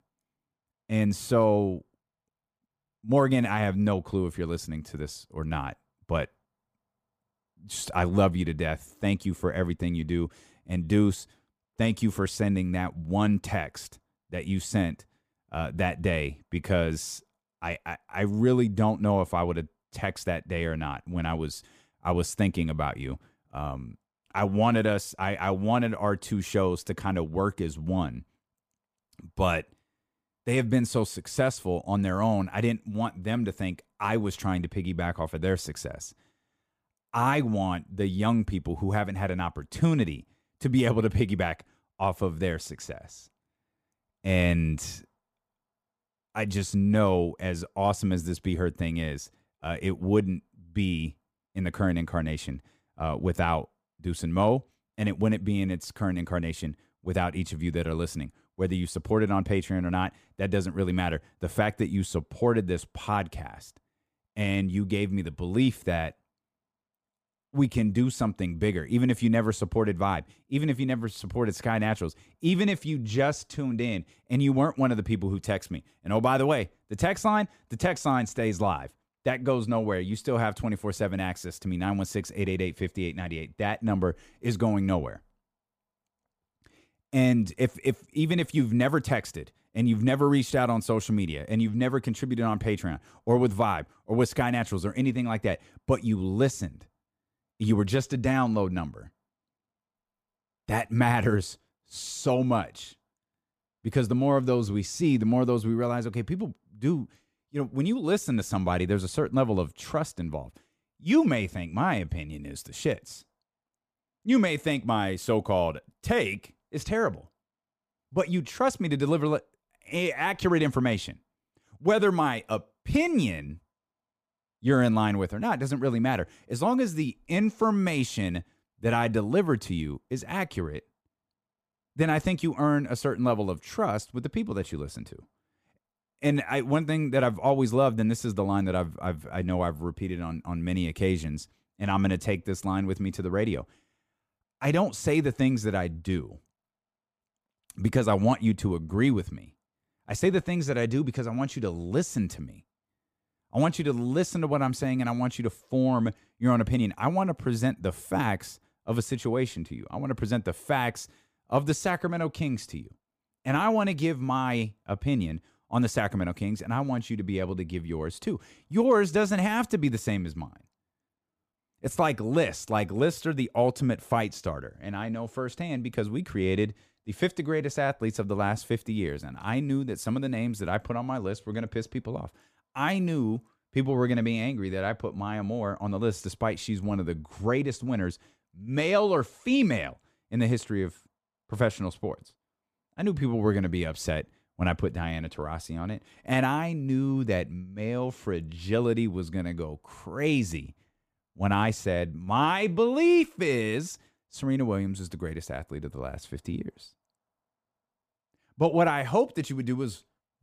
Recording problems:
none

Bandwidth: 15 kHz